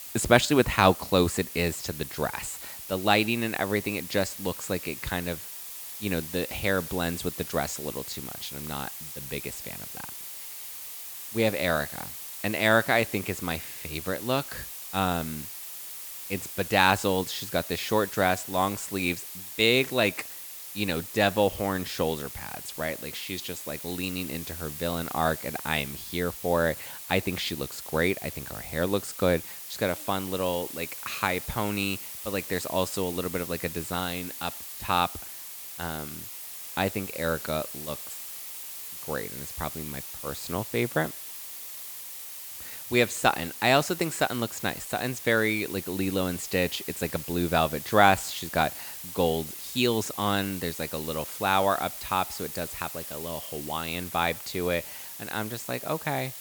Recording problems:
hiss; loud; throughout; 9 dB below the speech

